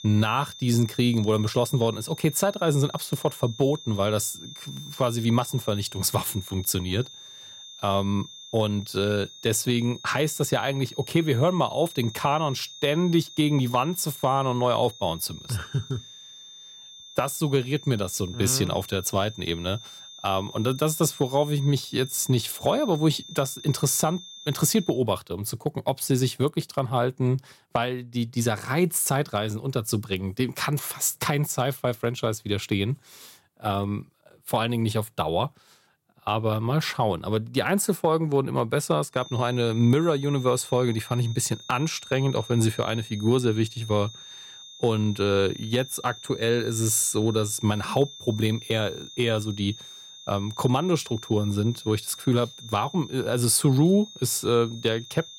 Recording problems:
high-pitched whine; noticeable; until 25 s and from 39 s on; 3.5 kHz, 15 dB below the speech

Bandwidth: 16.5 kHz